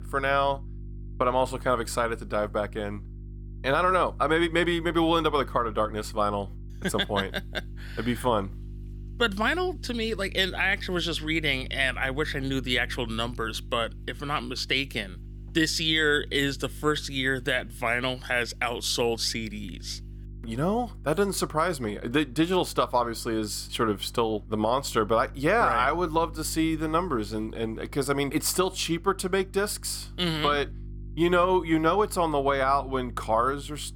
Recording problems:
electrical hum; faint; throughout; 50 Hz, 30 dB below the speech

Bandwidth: 18.5 kHz